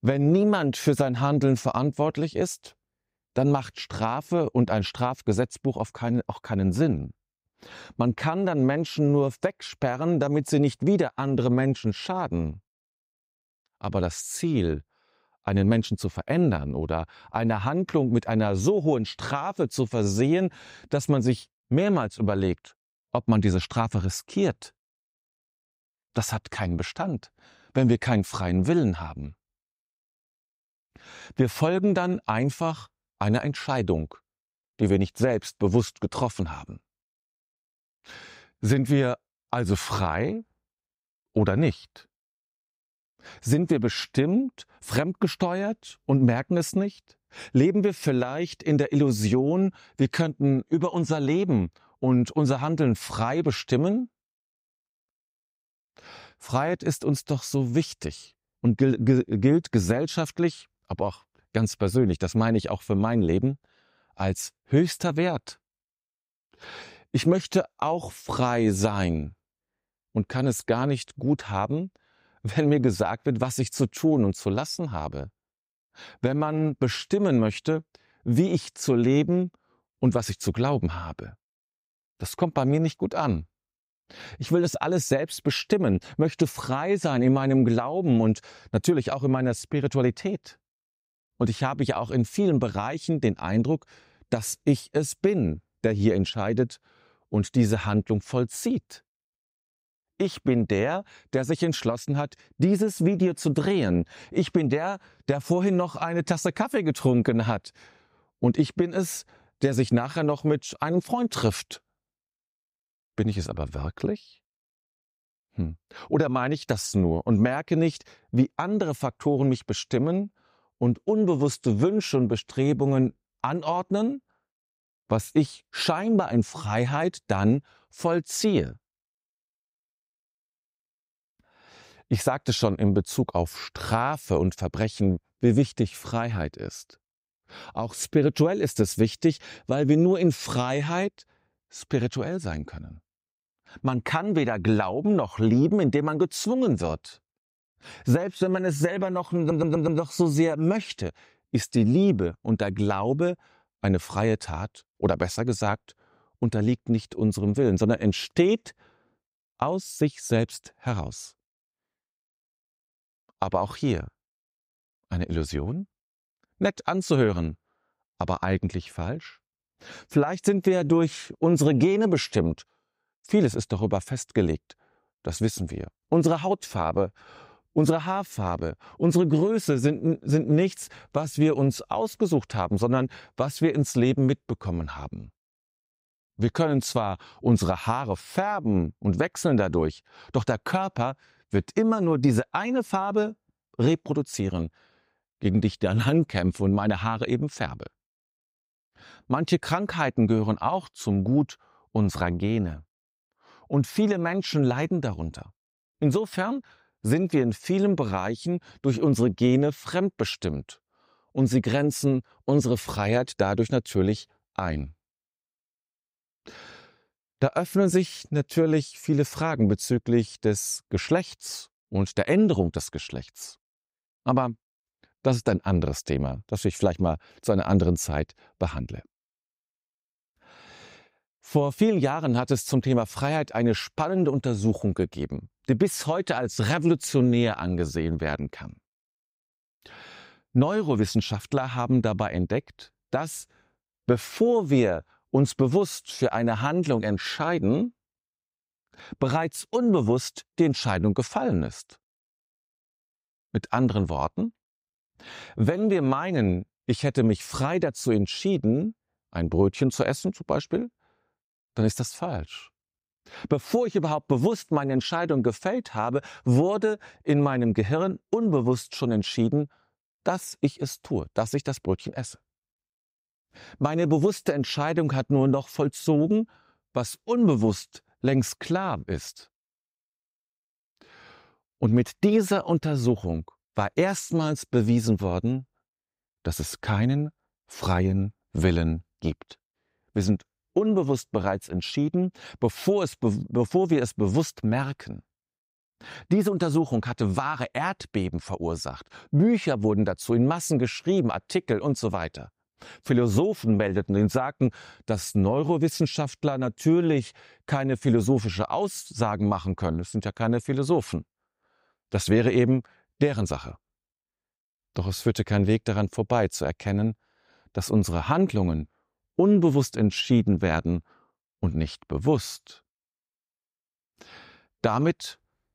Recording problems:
audio stuttering; at 2:29

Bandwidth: 15.5 kHz